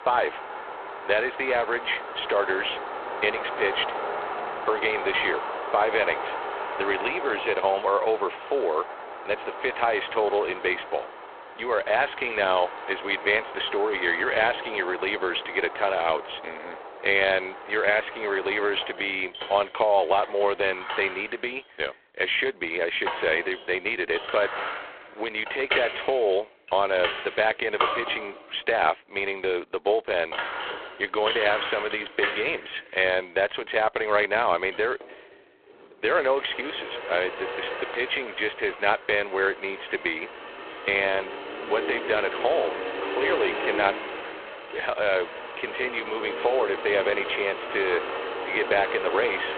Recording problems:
phone-call audio; poor line
traffic noise; loud; throughout; 8 dB below the speech

